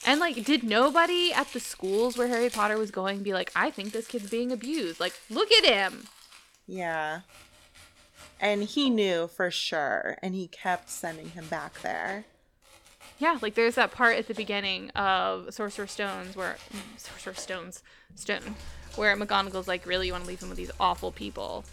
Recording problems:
household noises; noticeable; throughout; 20 dB below the speech

